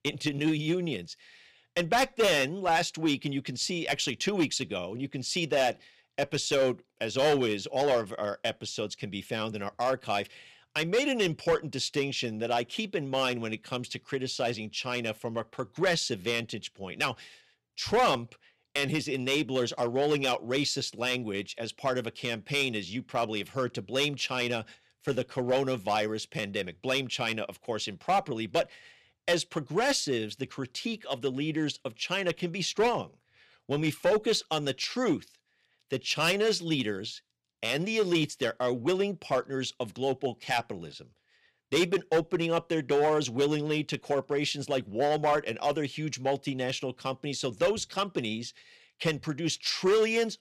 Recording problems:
distortion; slight; 3% of the sound clipped

